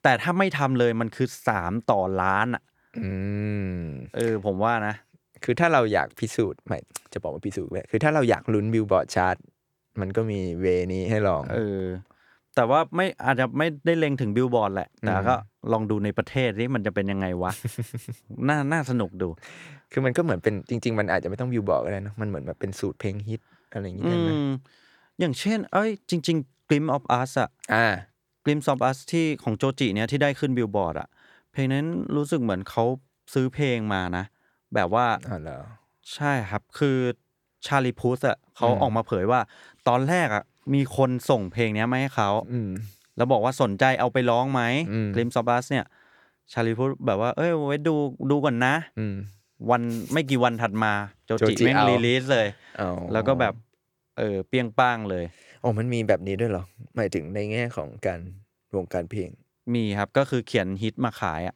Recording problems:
none

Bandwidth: 18.5 kHz